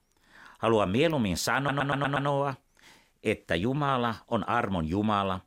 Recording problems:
audio stuttering; at 1.5 s

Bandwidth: 16 kHz